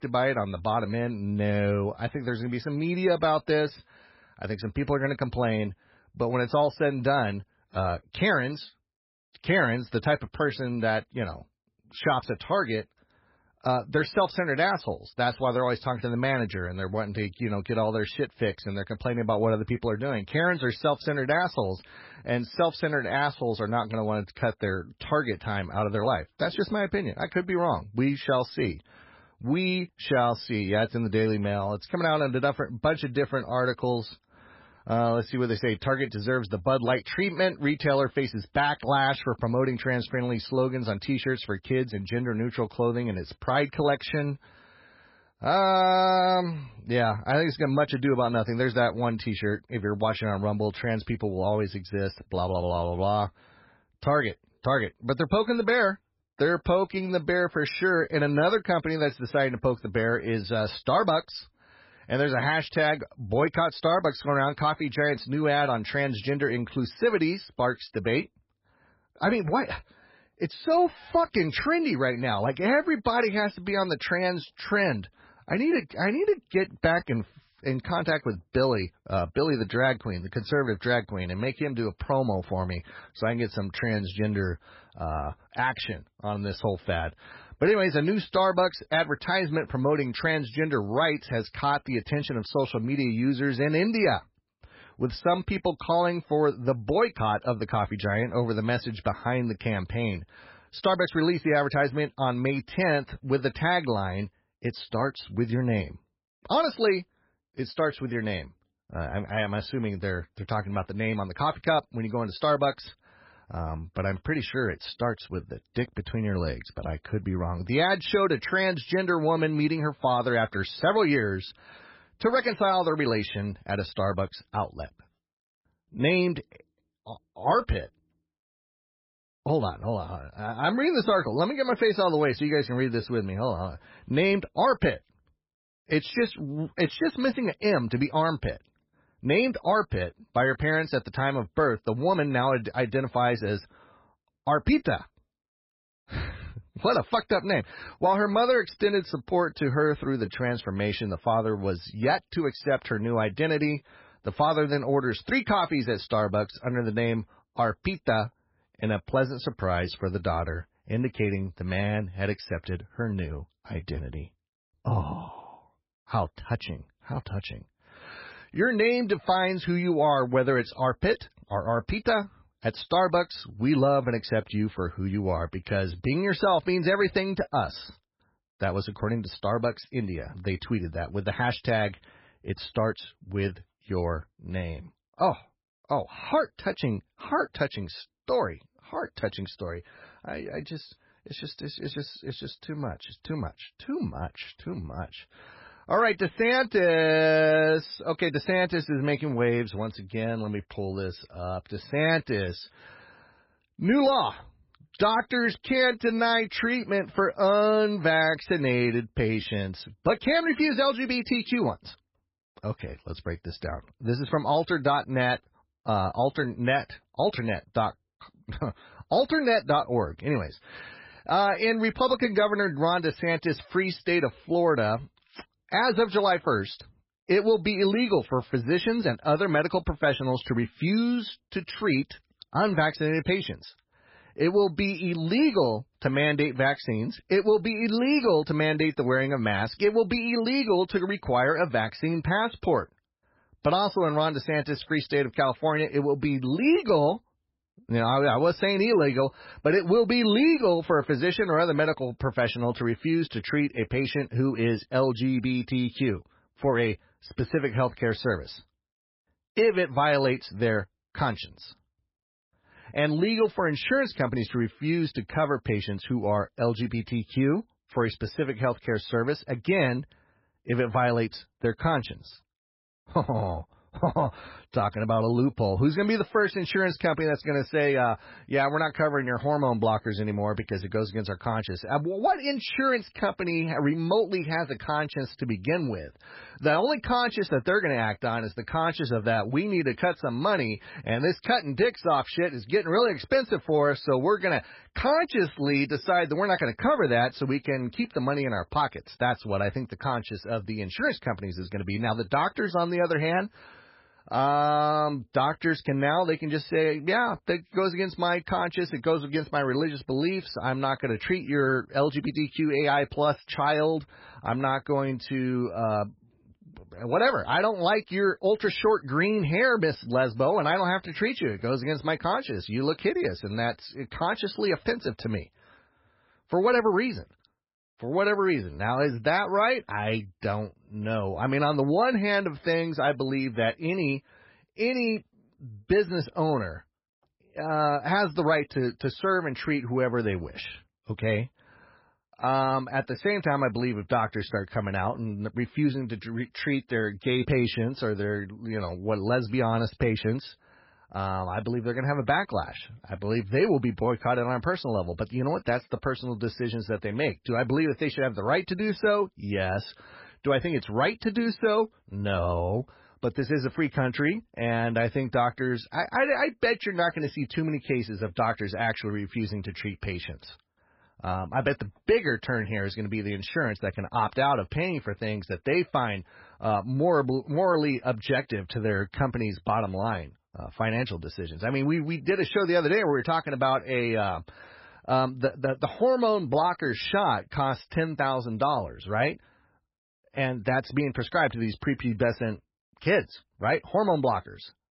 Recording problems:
garbled, watery; badly; nothing above 5.5 kHz

